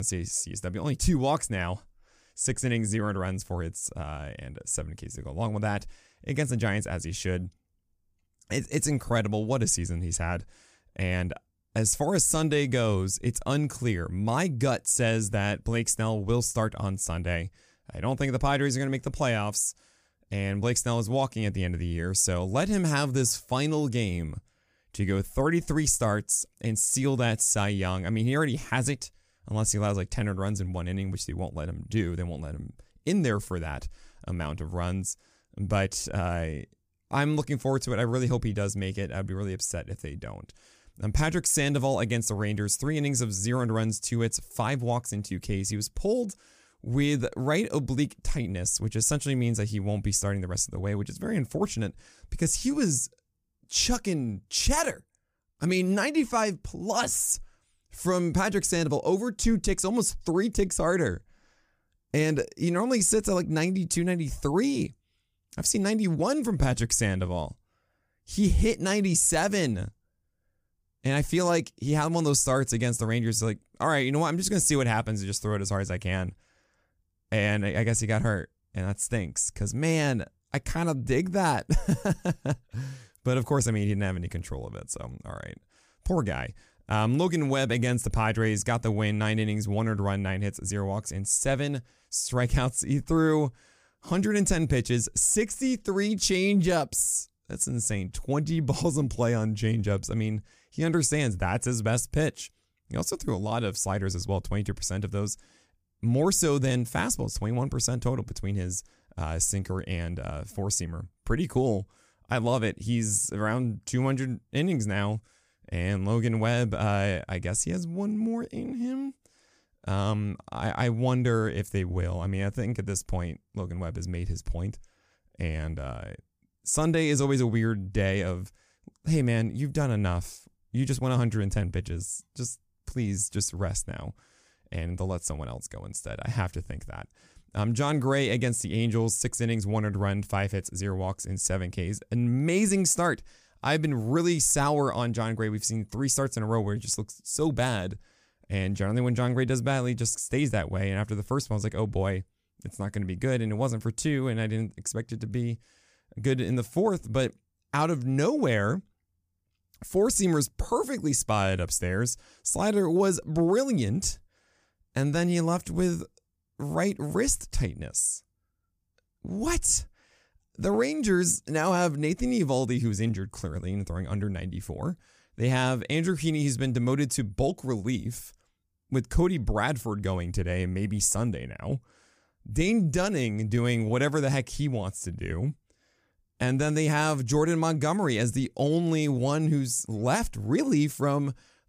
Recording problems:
abrupt cut into speech; at the start

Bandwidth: 15 kHz